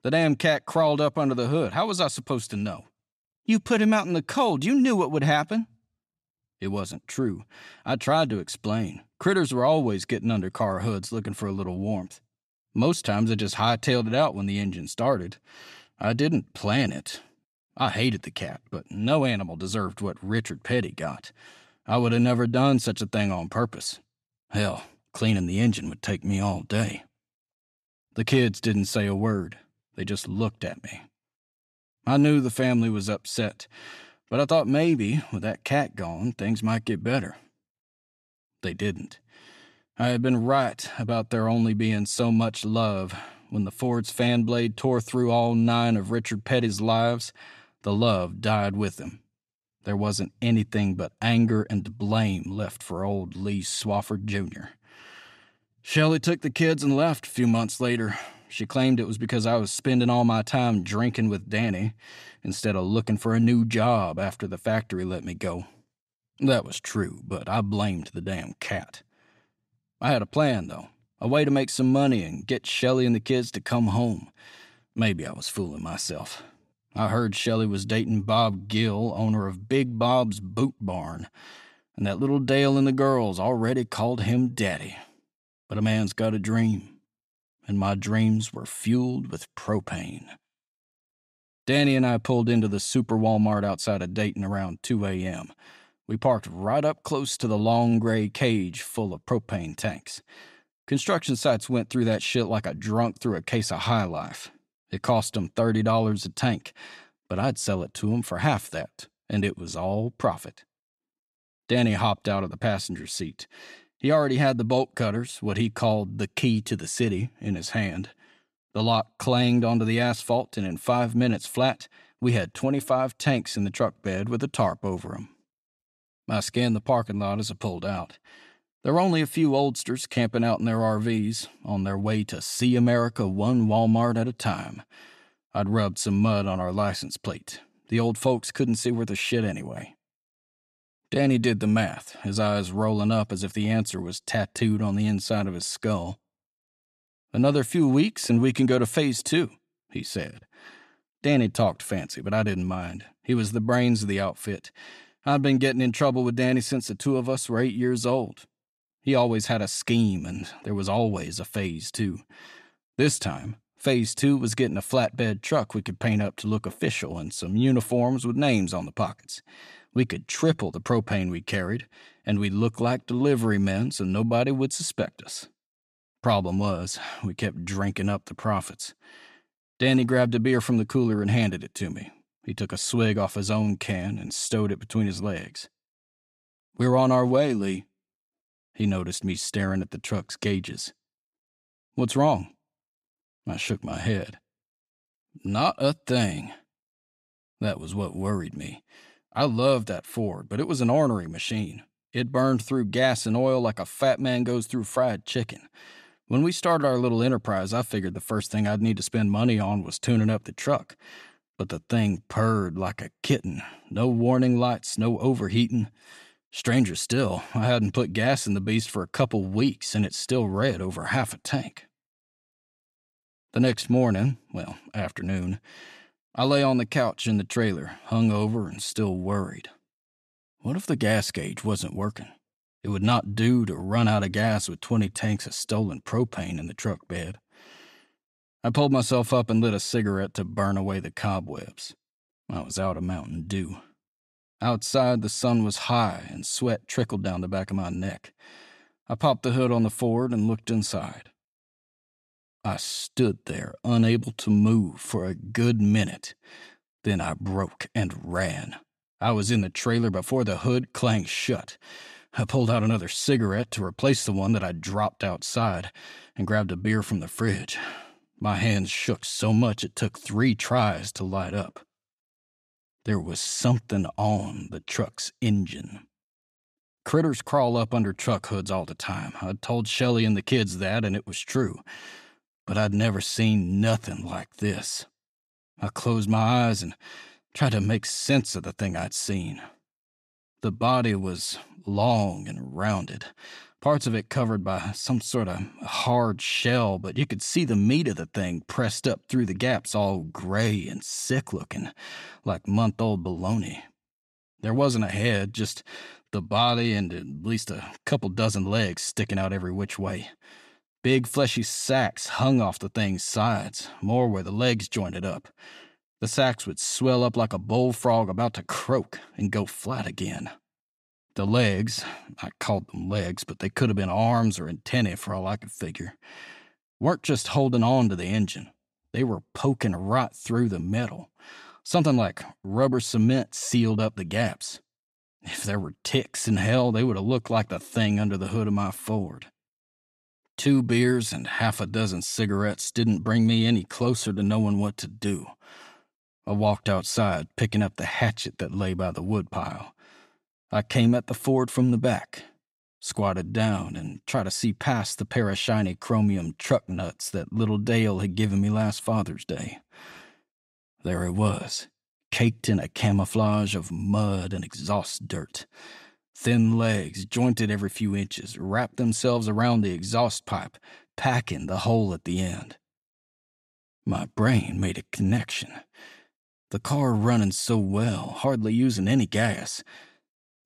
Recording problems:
none

